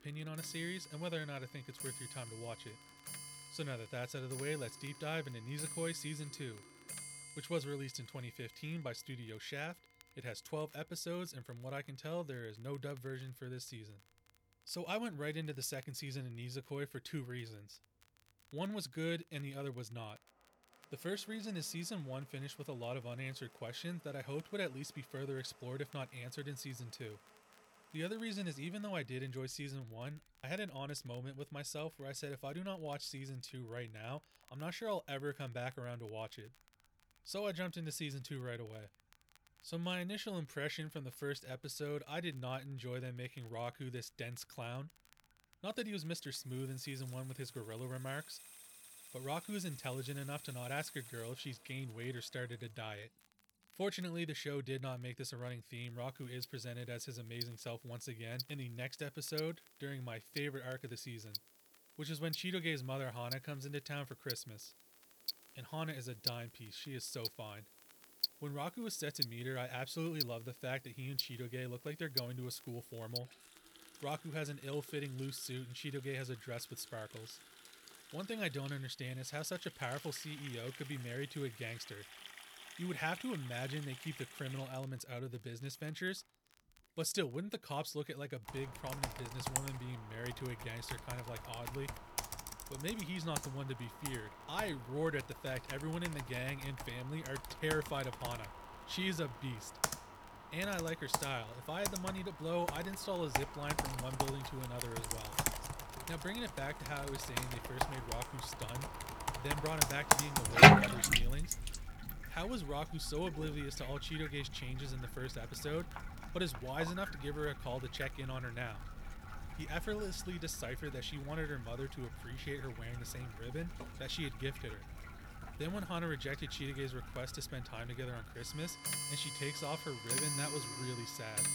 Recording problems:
household noises; very loud; throughout; 5 dB above the speech
crackle, like an old record; faint; 25 dB below the speech

